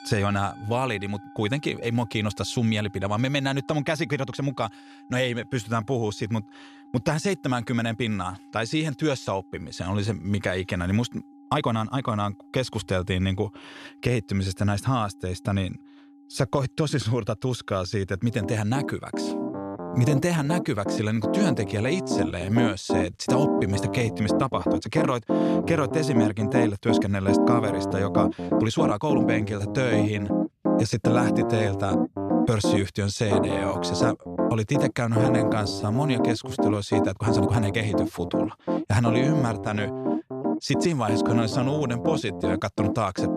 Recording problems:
background music; very loud; throughout; as loud as the speech
uneven, jittery; strongly; from 4 to 42 s

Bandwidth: 14 kHz